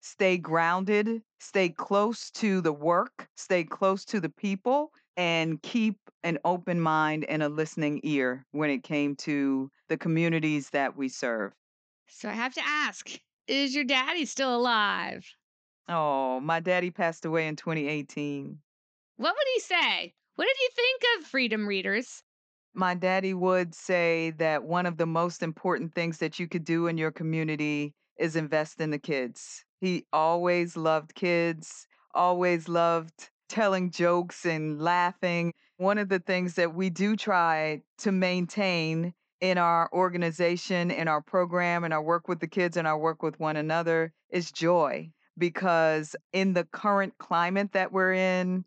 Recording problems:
high frequencies cut off; noticeable; nothing above 8 kHz

